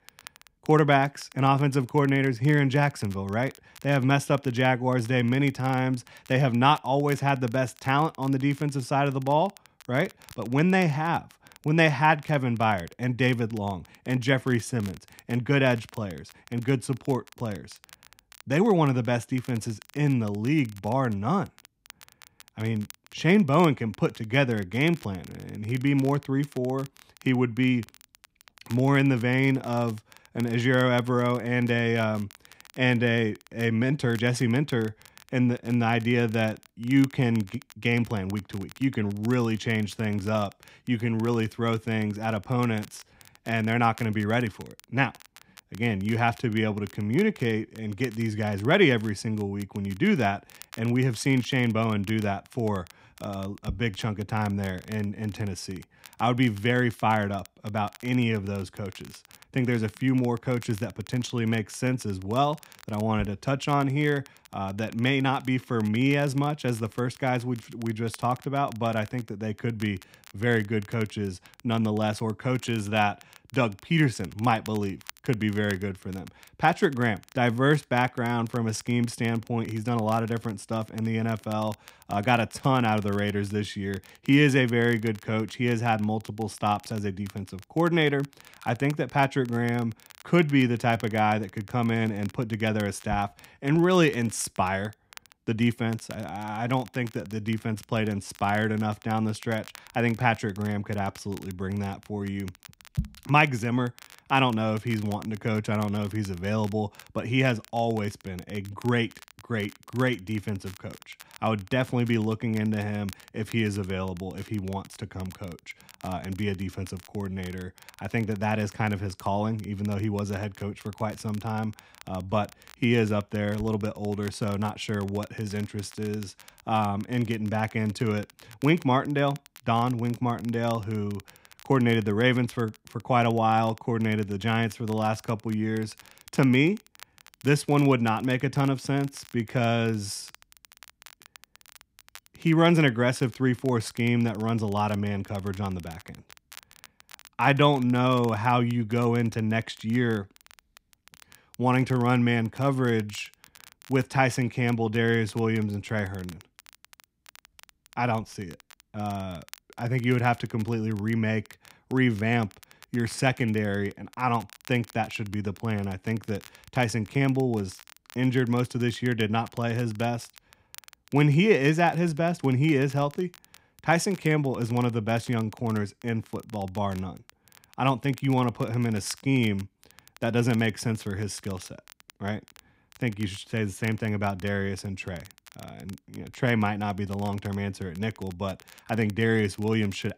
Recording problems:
crackle, like an old record; faint; 25 dB below the speech

